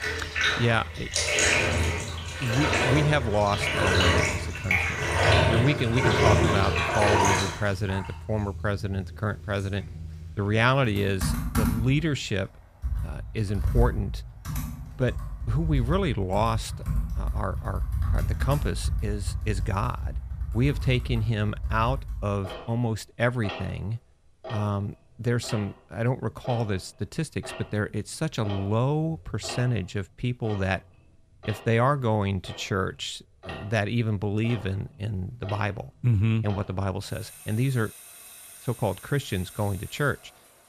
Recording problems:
household noises; very loud; throughout; as loud as the speech

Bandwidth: 14.5 kHz